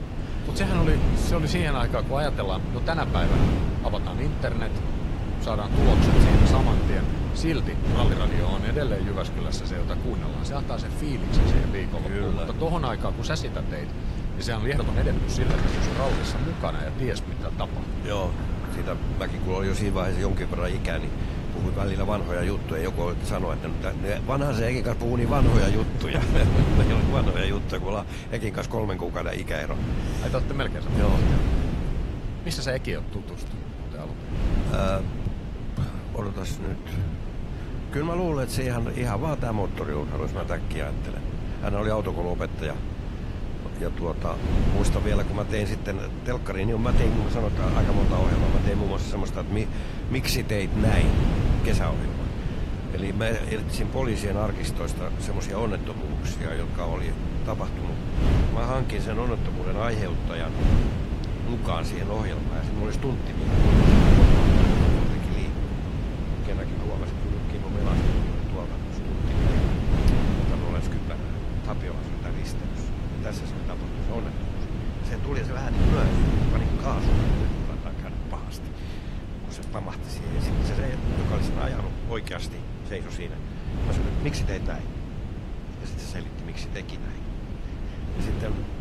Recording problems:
garbled, watery; slightly; nothing above 16 kHz
wind noise on the microphone; heavy; 3 dB below the speech
rain or running water; noticeable; throughout; 15 dB below the speech
uneven, jittery; strongly; from 8 s to 1:24

